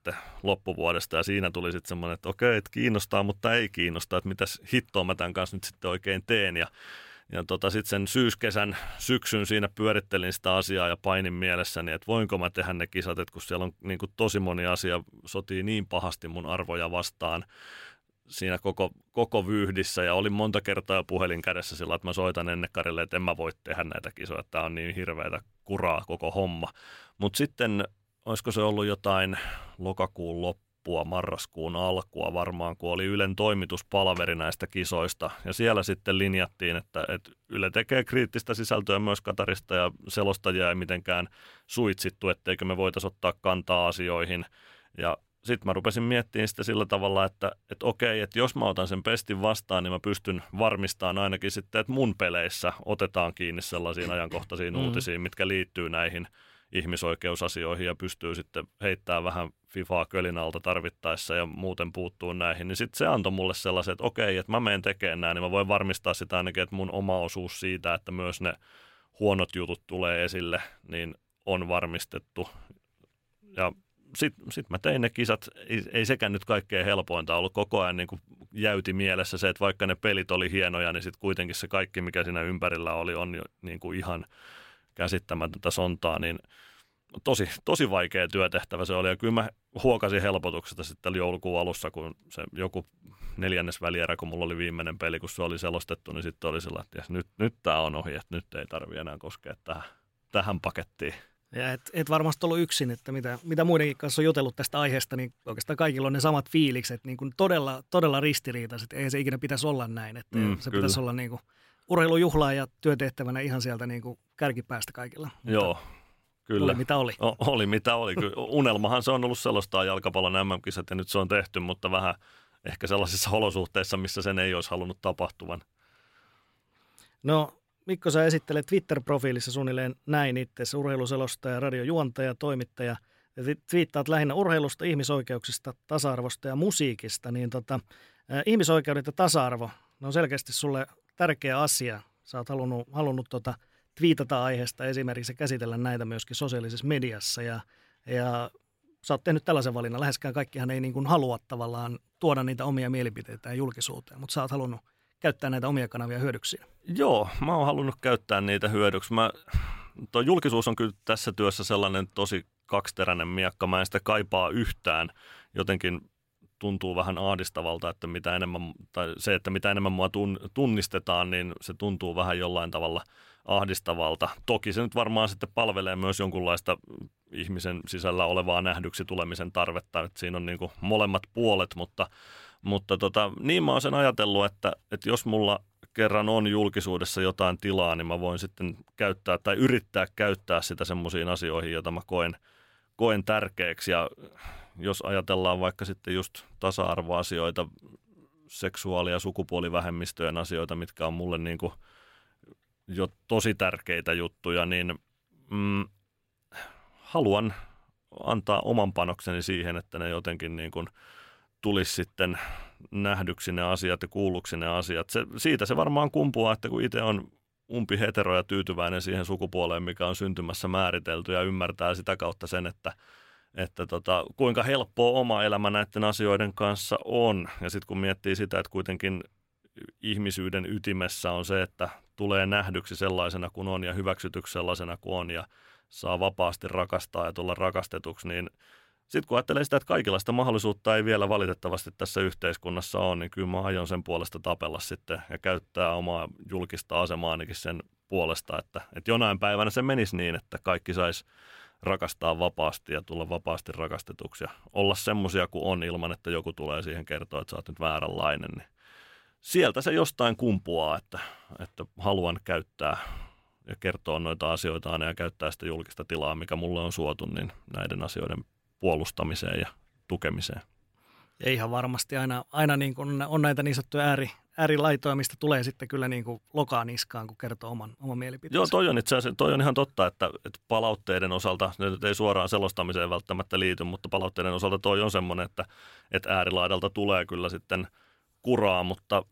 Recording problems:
uneven, jittery; strongly; from 1:27 to 4:44

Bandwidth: 16 kHz